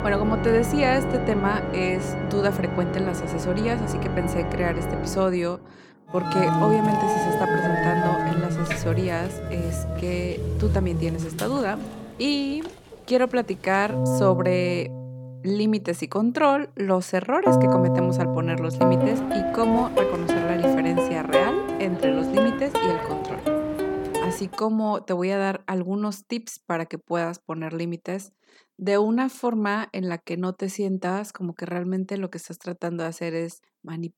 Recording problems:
background music; very loud; until 24 s; 1 dB above the speech

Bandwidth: 17.5 kHz